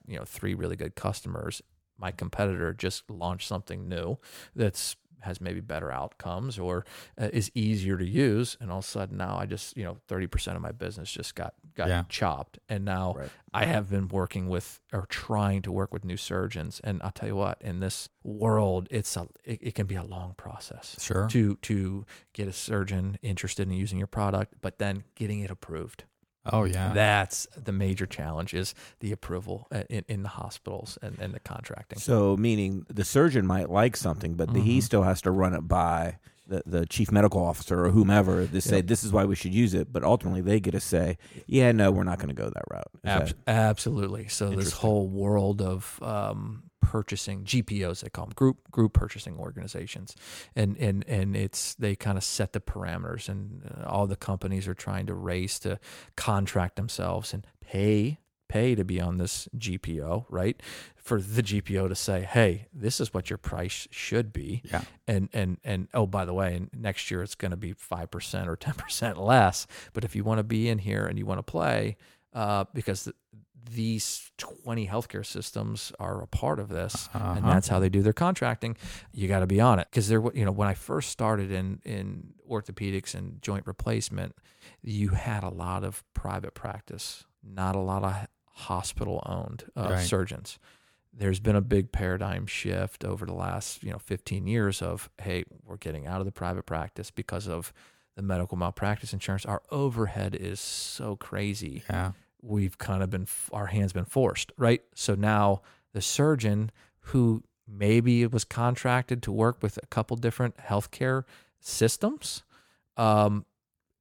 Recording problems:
none

